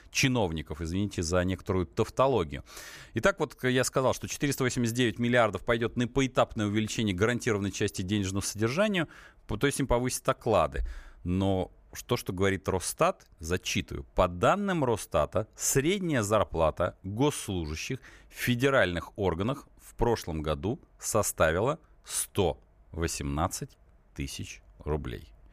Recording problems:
none

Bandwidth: 15 kHz